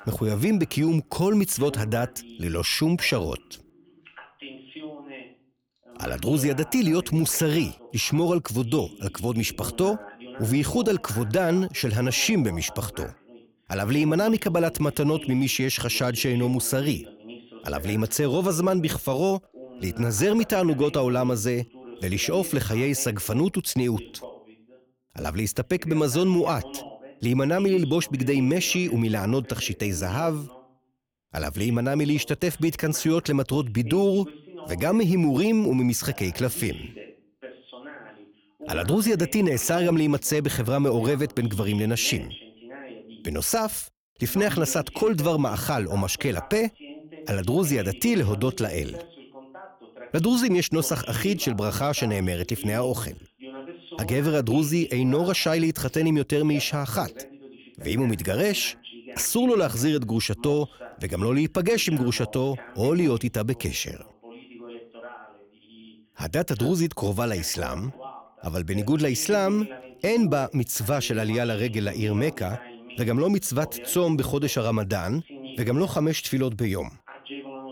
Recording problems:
voice in the background; noticeable; throughout; 20 dB below the speech

